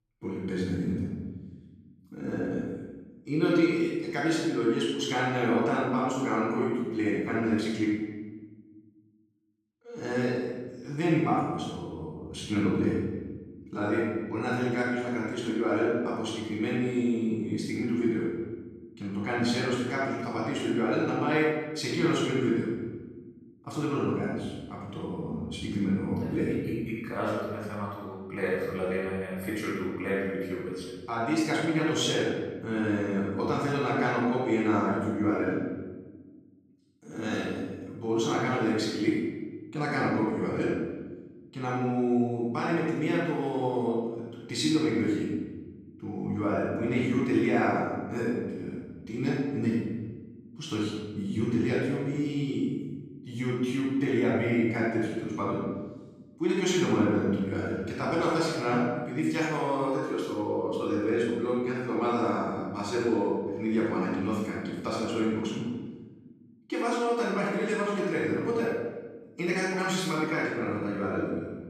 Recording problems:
room echo; strong; dies away in 1.3 s
off-mic speech; far

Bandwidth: 14.5 kHz